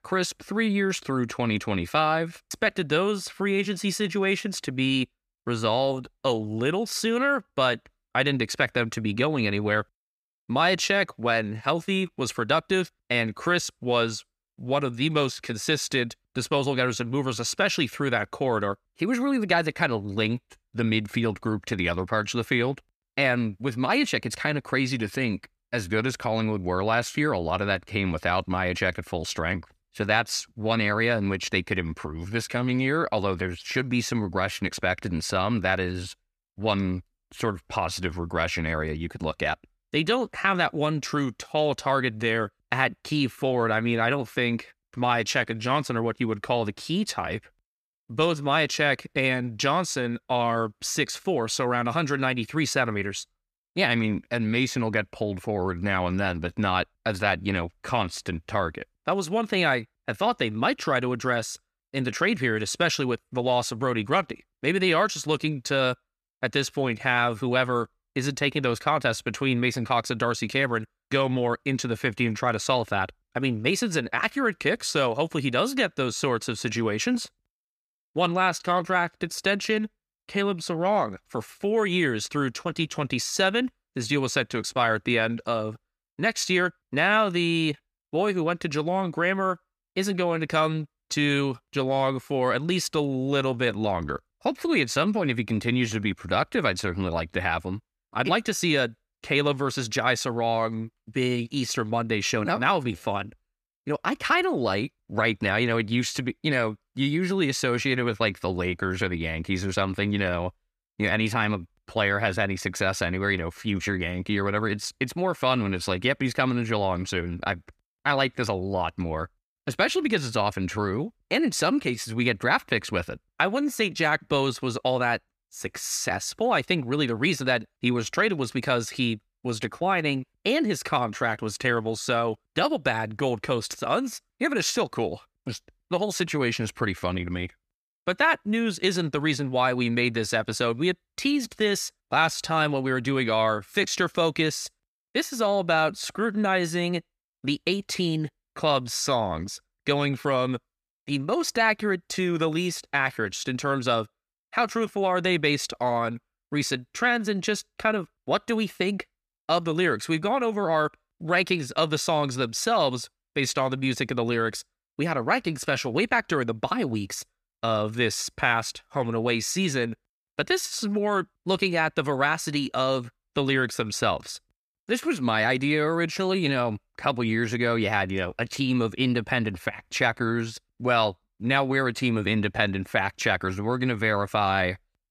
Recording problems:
none

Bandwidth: 14.5 kHz